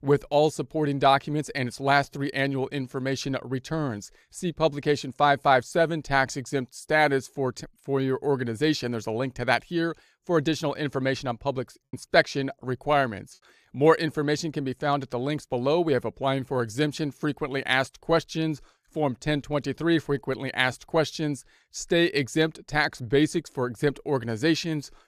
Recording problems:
choppy; occasionally; at 12 s; 1% of the speech affected

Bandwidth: 14.5 kHz